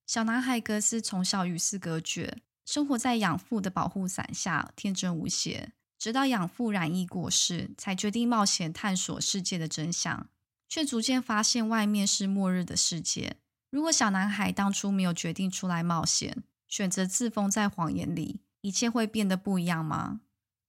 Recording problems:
none

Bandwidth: 16 kHz